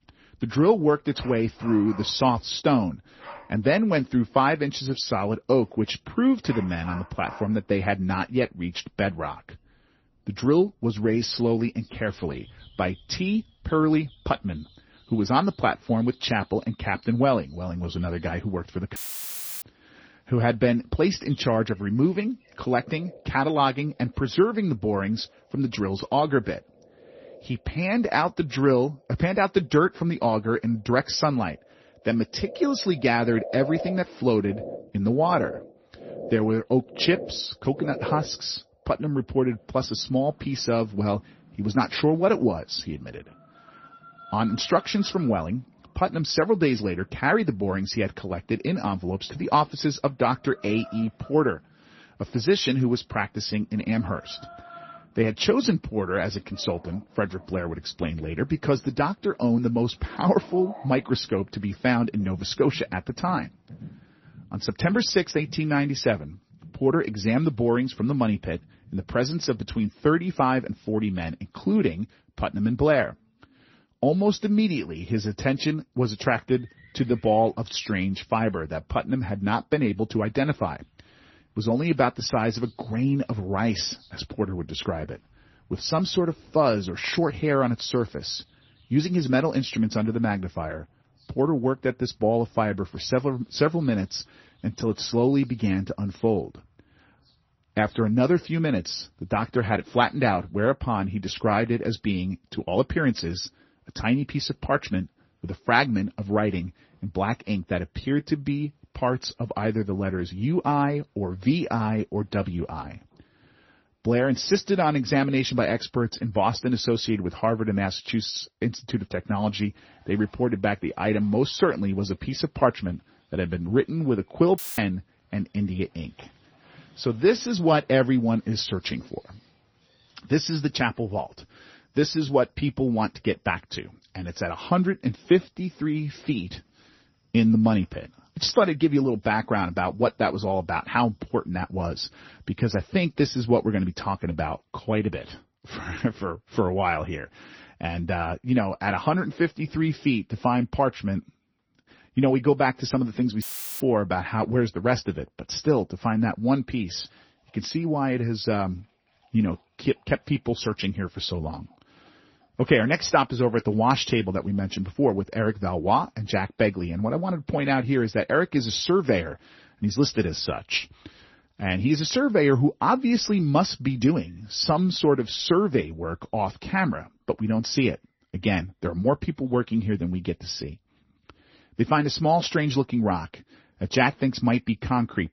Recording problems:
garbled, watery; slightly; nothing above 6 kHz
animal sounds; faint; throughout; 20 dB below the speech
audio cutting out; filled with static; at 19 s for 0.5 s, at 2:05 and at 2:33

